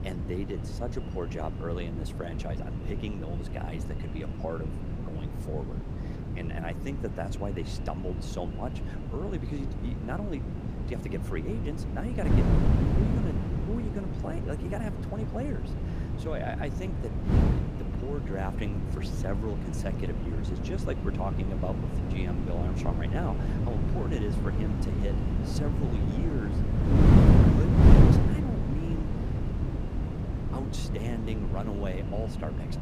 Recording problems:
echo of what is said; faint; throughout; 470 ms later, 20 dB below the speech
wind noise on the microphone; heavy; 2 dB above the speech

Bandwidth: 15 kHz